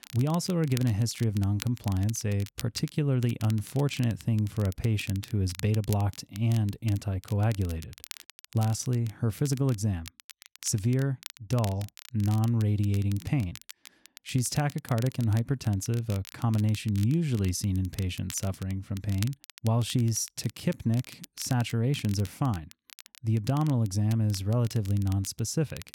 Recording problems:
crackle, like an old record; noticeable; 20 dB below the speech

